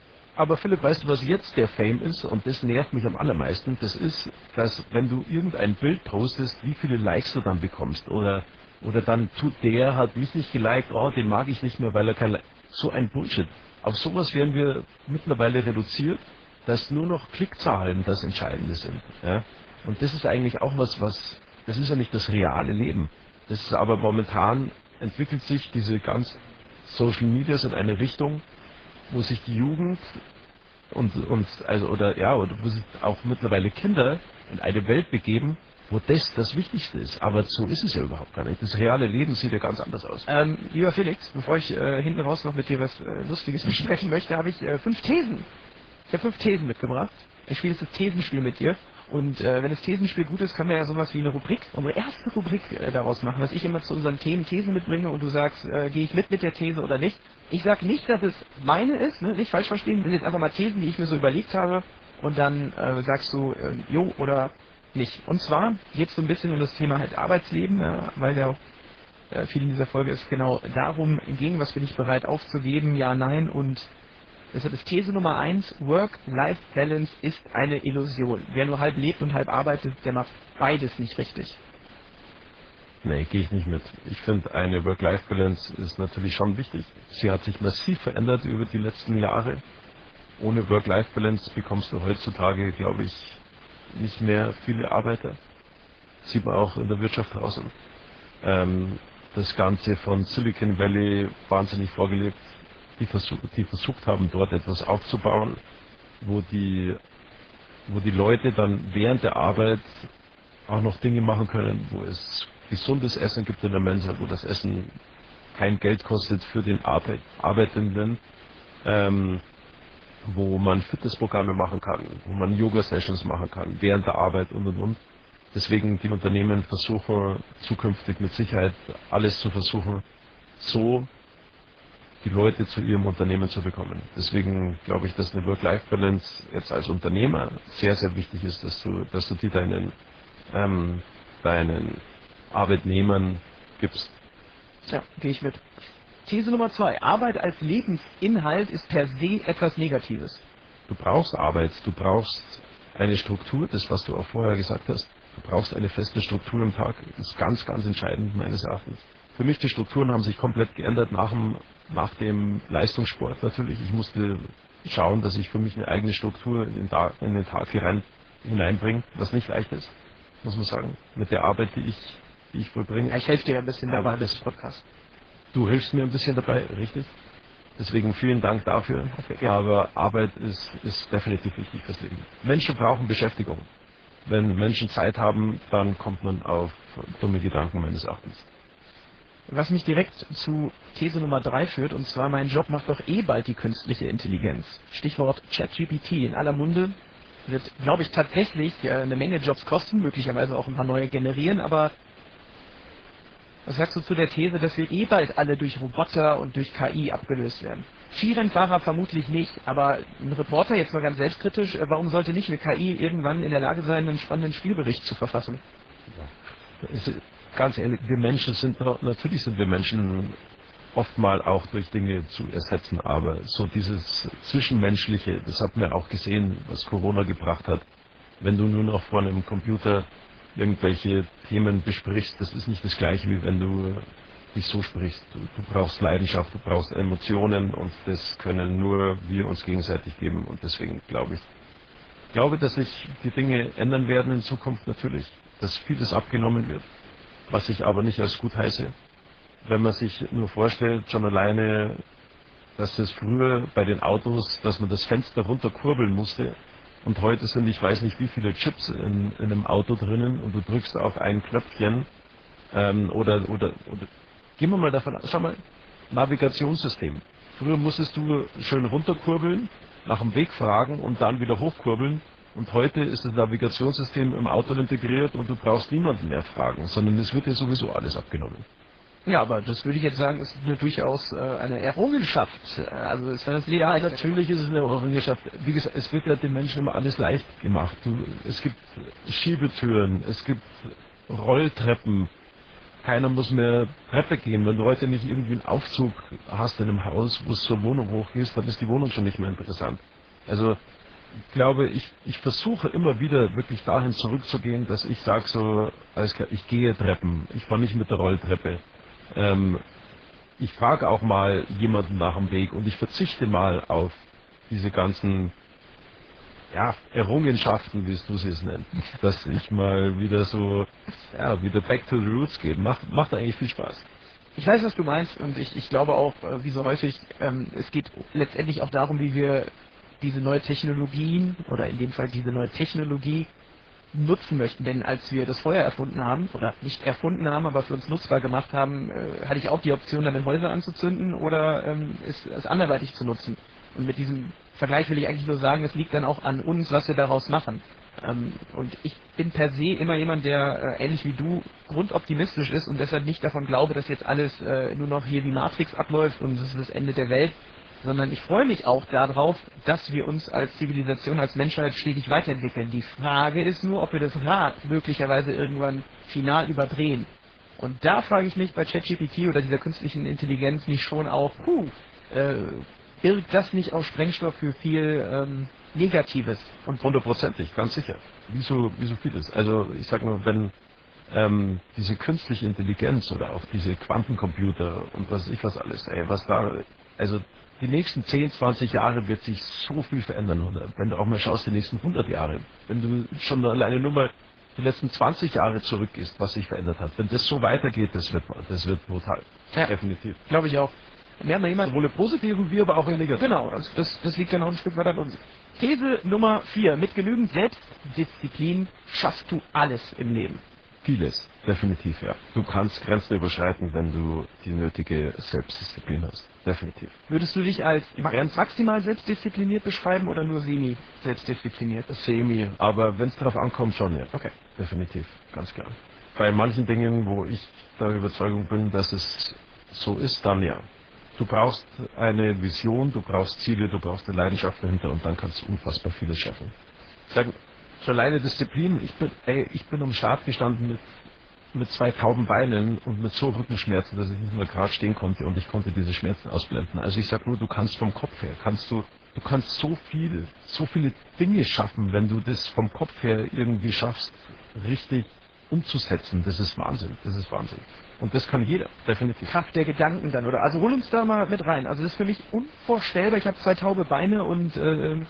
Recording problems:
garbled, watery; badly
hiss; faint; throughout; 25 dB below the speech

